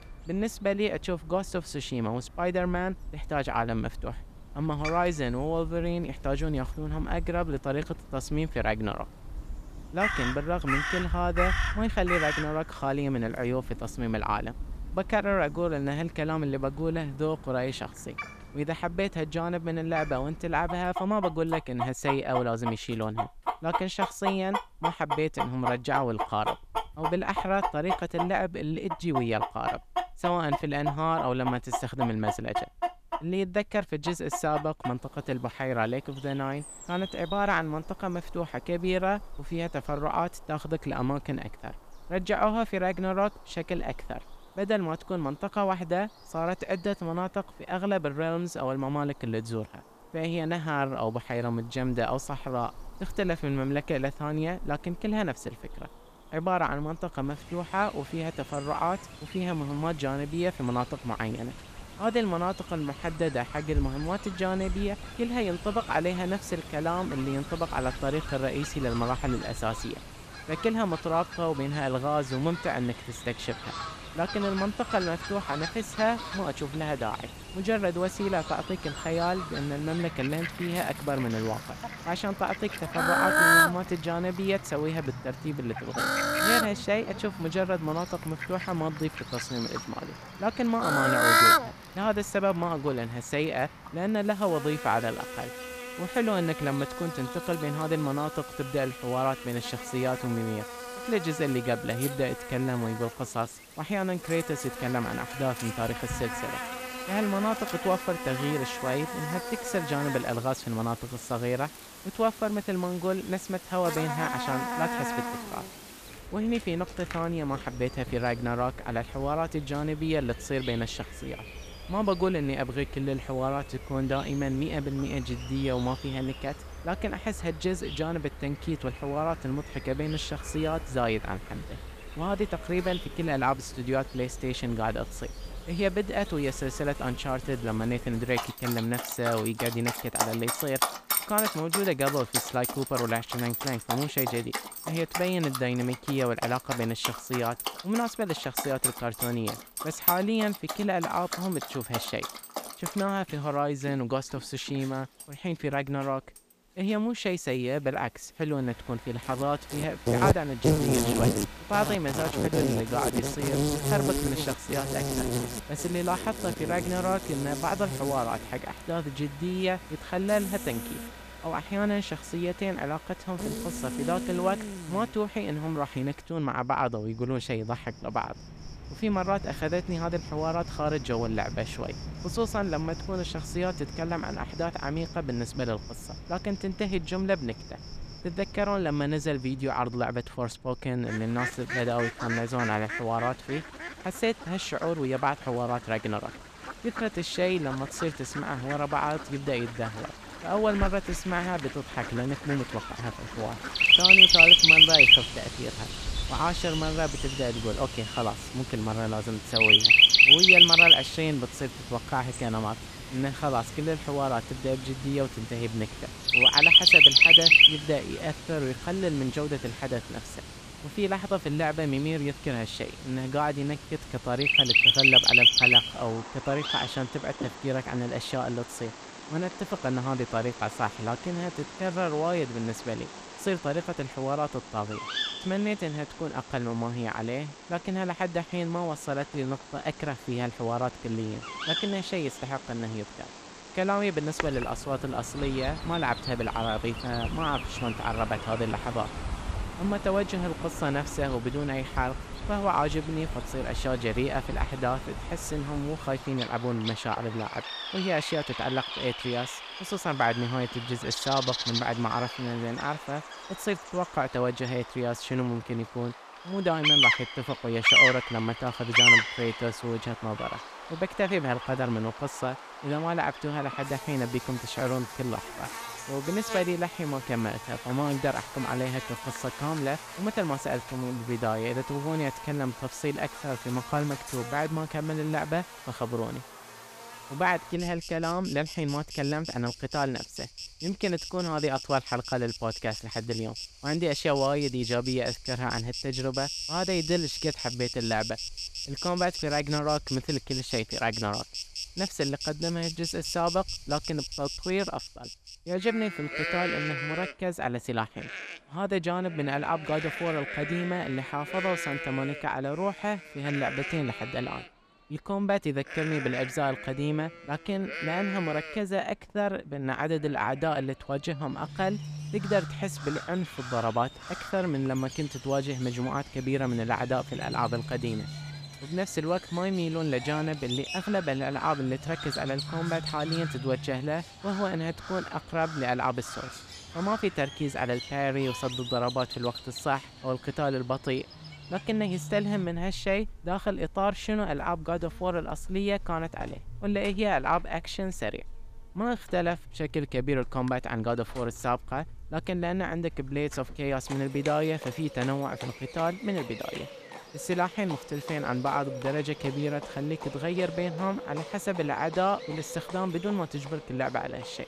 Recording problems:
animal sounds; very loud; throughout; 5 dB above the speech

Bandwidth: 14.5 kHz